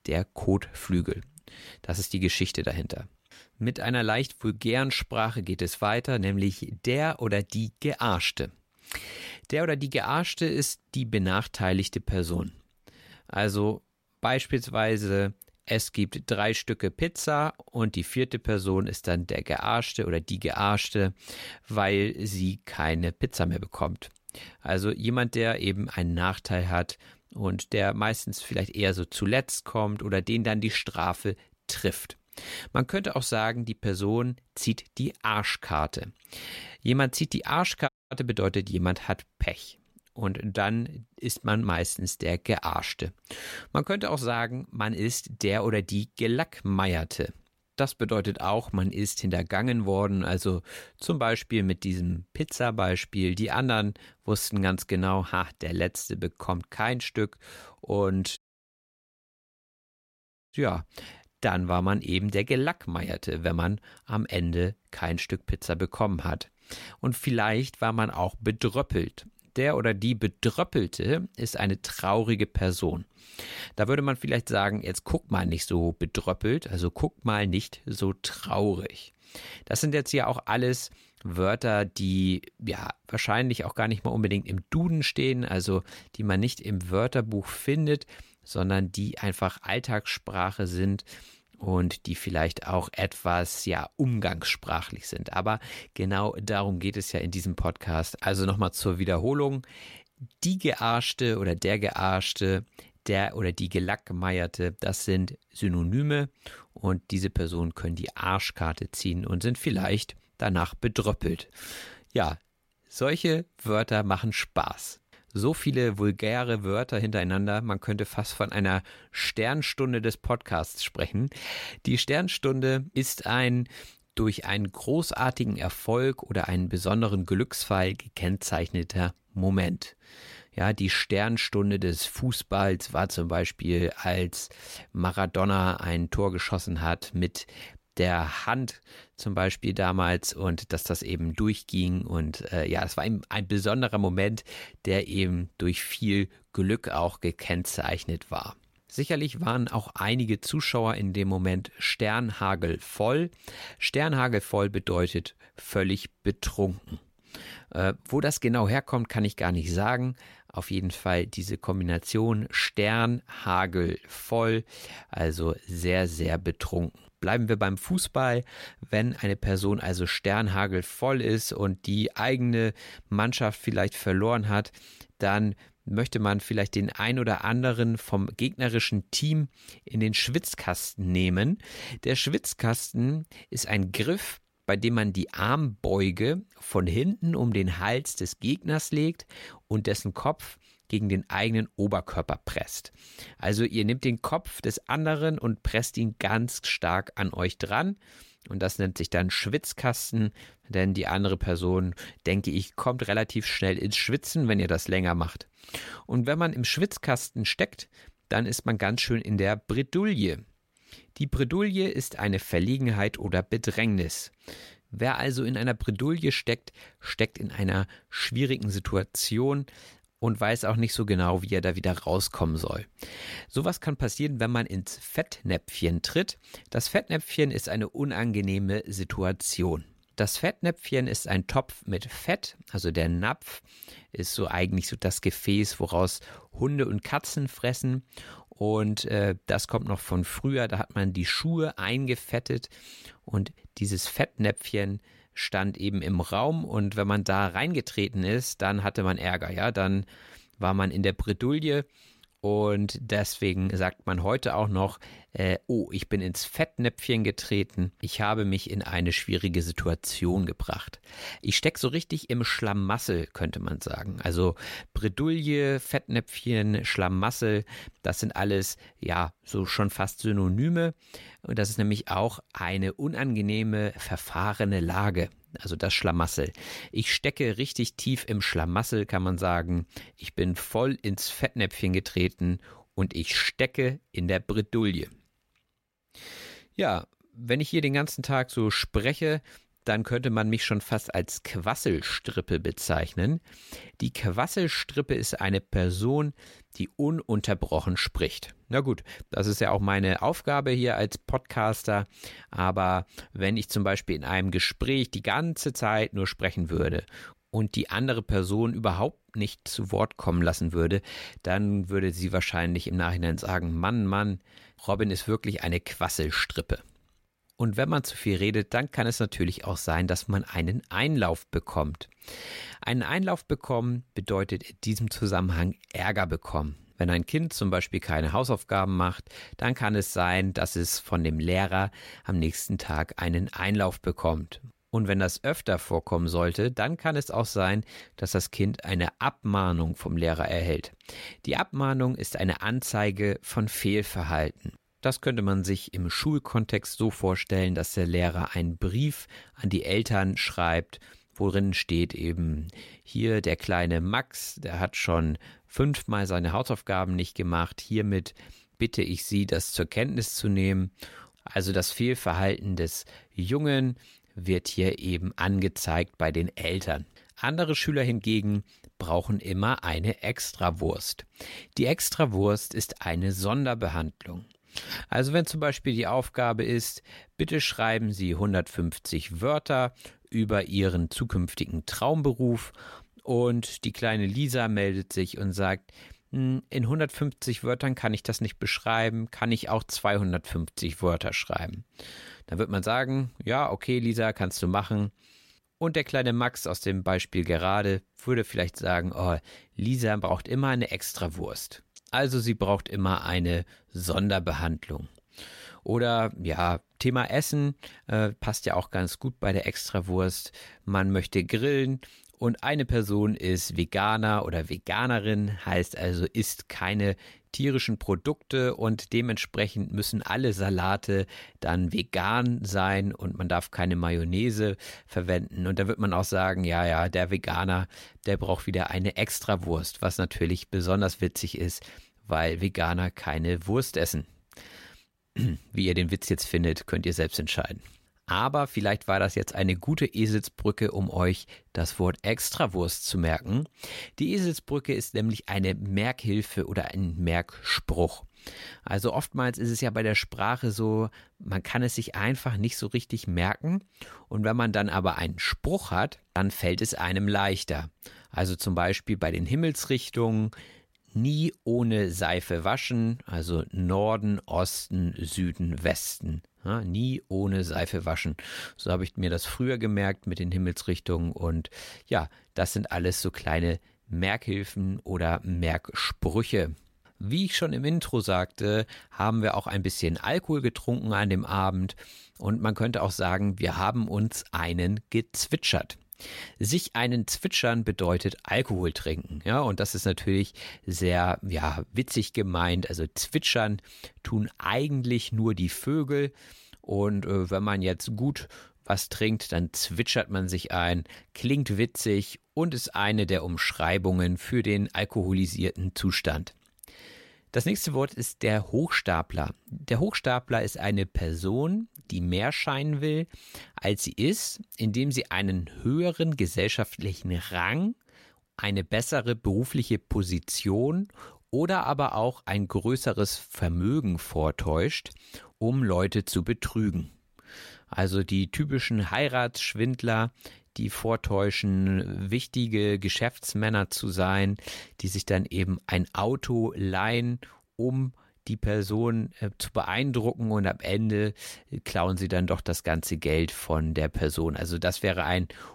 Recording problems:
audio cutting out; at 38 s and at 58 s for 2 s

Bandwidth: 16 kHz